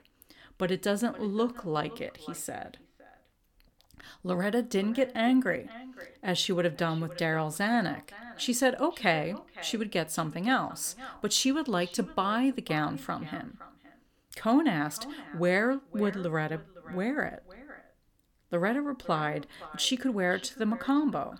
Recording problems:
echo of what is said; faint; throughout; 510 ms later, 20 dB below the speech

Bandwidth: 18 kHz